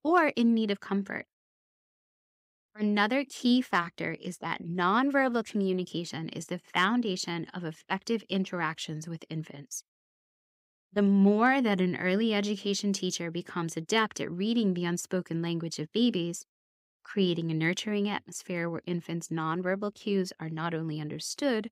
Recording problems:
none

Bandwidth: 15.5 kHz